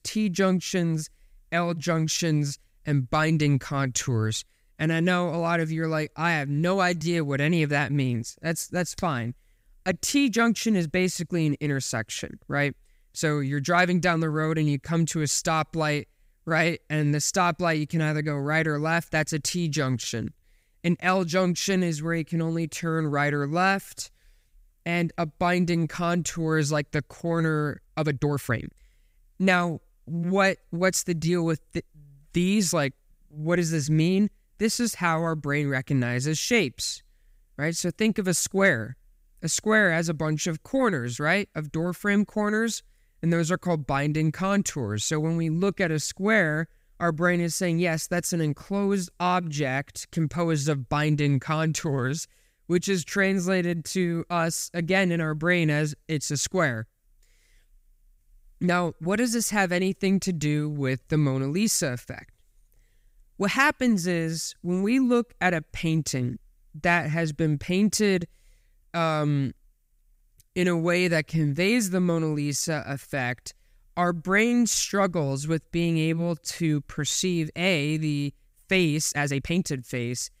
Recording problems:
uneven, jittery; strongly; from 9.5 s to 1:20

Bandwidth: 15.5 kHz